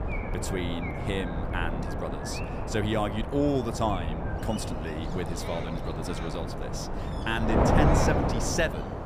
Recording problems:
wind noise on the microphone; heavy; as loud as the speech
animal sounds; noticeable; throughout; 15 dB below the speech
low rumble; faint; throughout; 25 dB below the speech

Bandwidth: 15 kHz